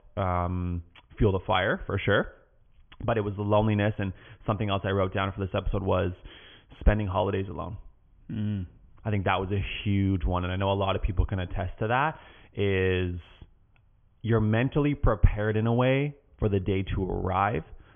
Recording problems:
high frequencies cut off; severe; nothing above 3.5 kHz

